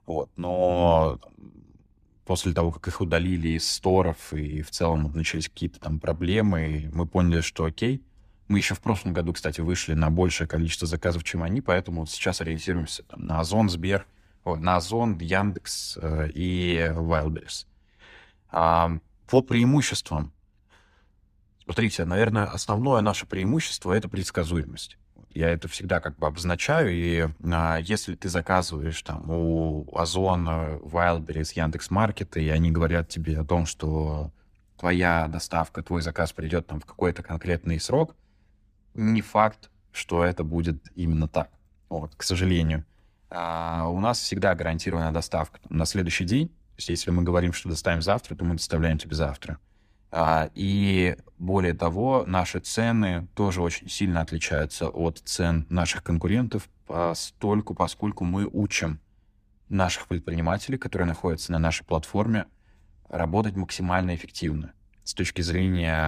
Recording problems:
abrupt cut into speech; at the end

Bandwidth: 15 kHz